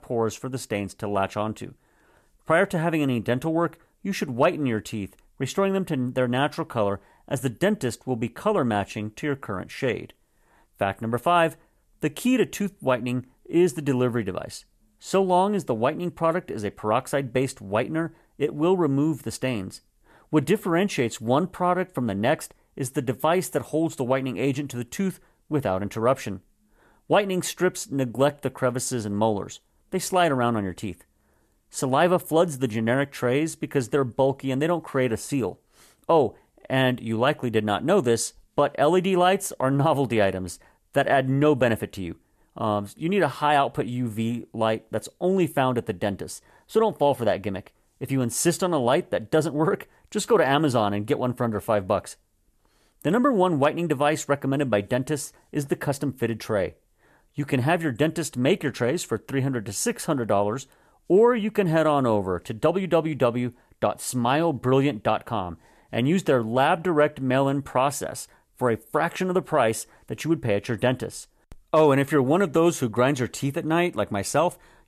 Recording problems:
none

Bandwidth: 14 kHz